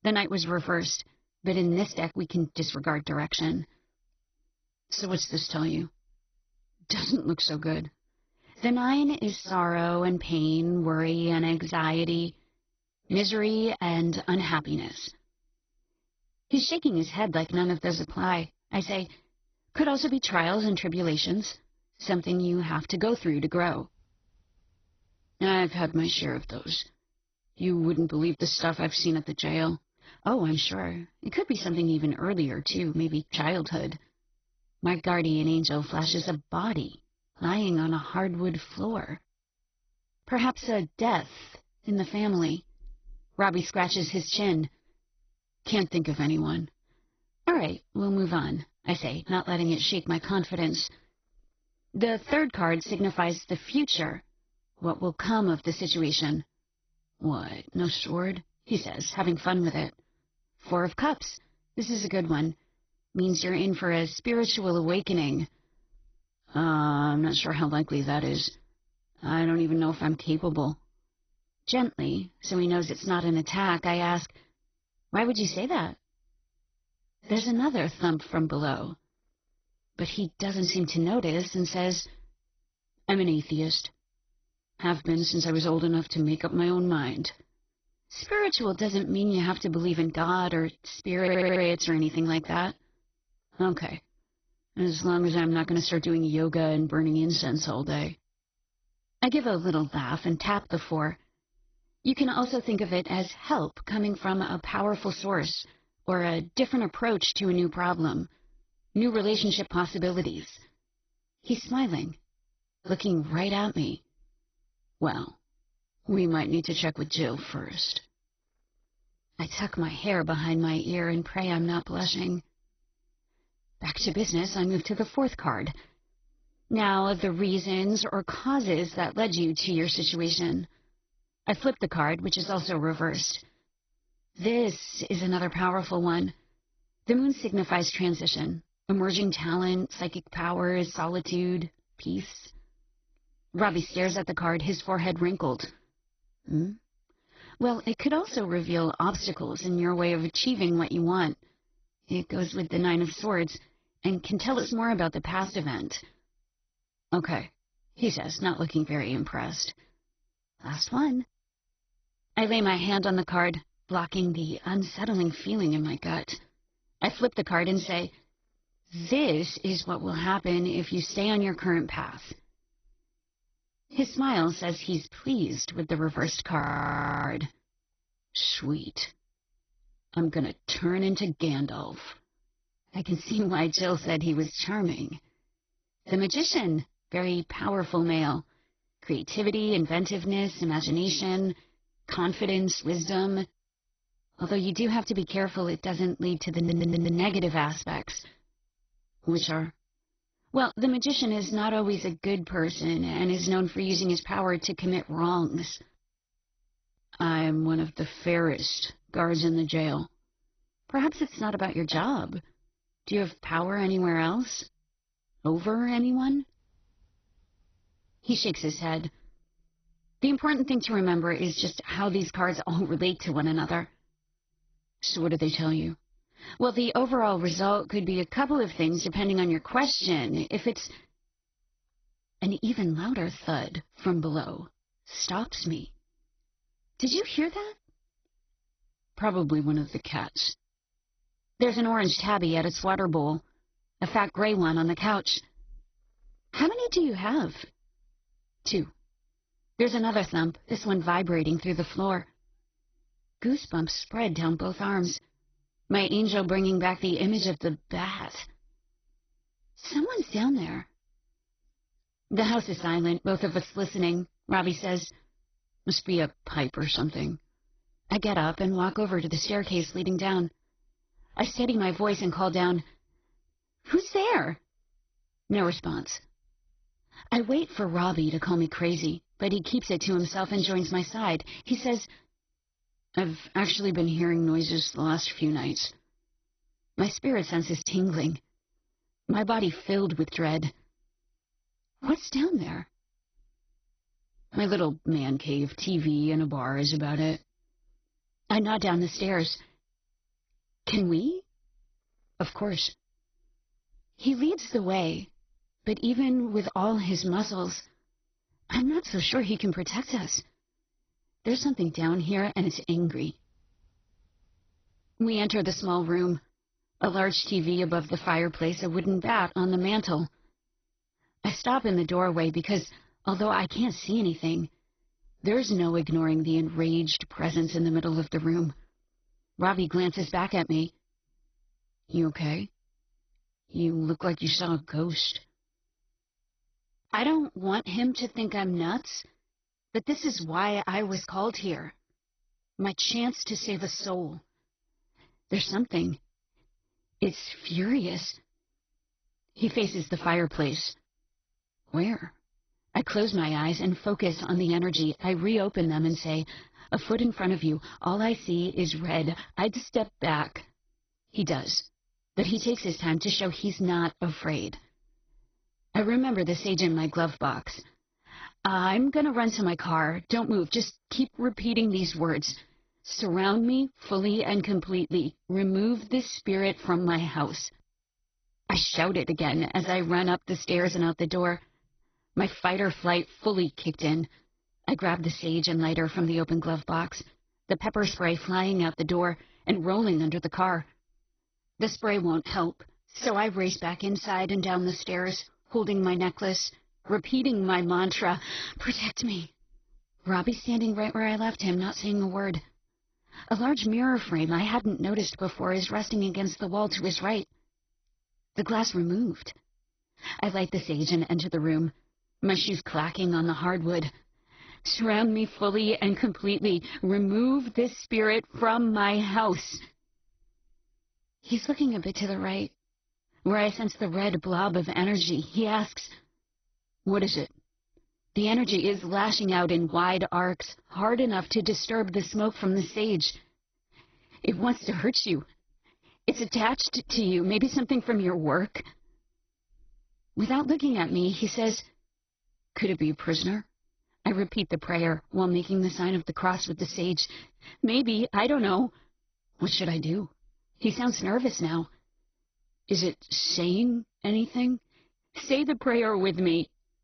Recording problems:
garbled, watery; badly; nothing above 6 kHz
audio stuttering; at 1:31 and at 3:17
audio freezing; at 2:57 for 0.5 s

